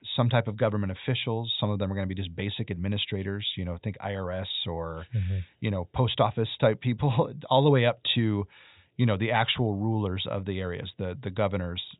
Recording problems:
high frequencies cut off; severe; nothing above 4 kHz

